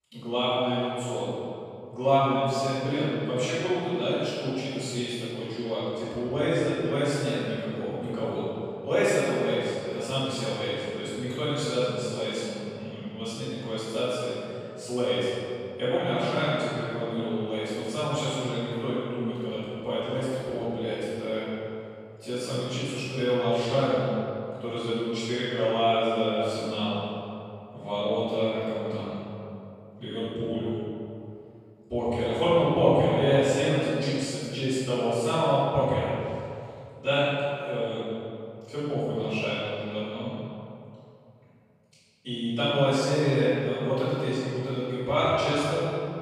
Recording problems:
room echo; strong; dies away in 2.3 s
off-mic speech; far

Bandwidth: 15.5 kHz